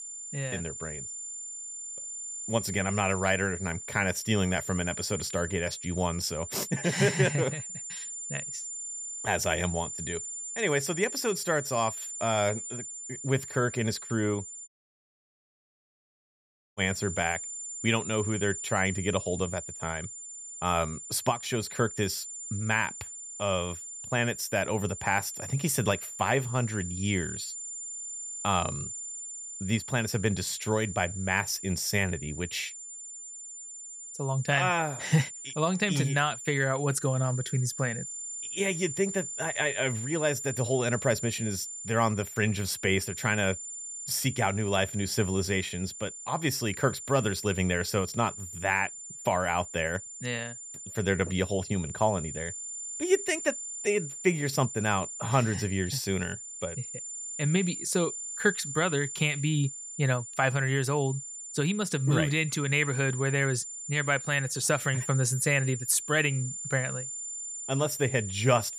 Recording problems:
high-pitched whine; loud; throughout; 7 kHz, 8 dB below the speech
audio cutting out; at 15 s for 2 s

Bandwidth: 15 kHz